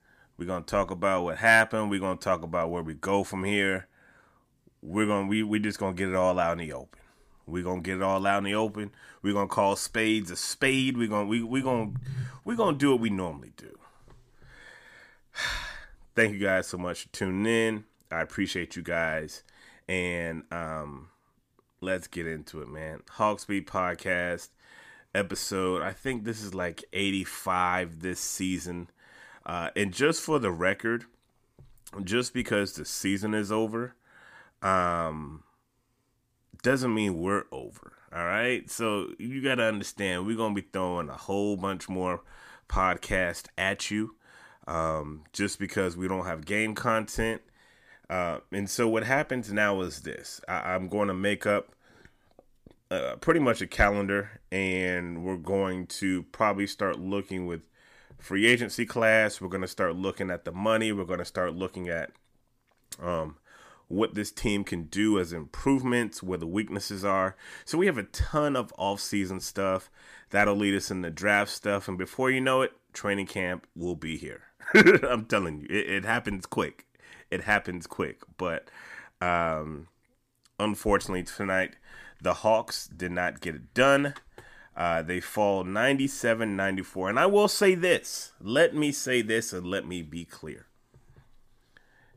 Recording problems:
none

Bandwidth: 15 kHz